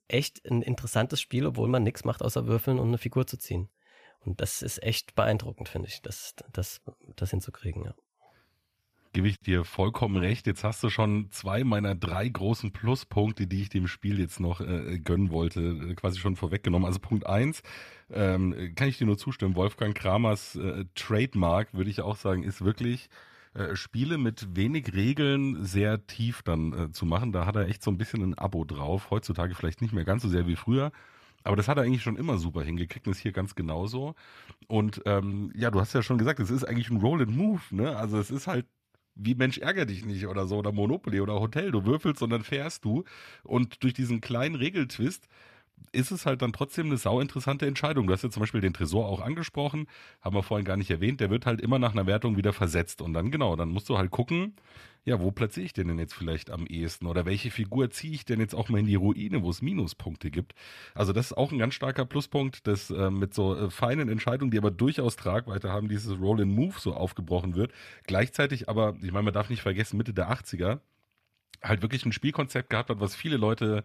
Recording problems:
none

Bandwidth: 14.5 kHz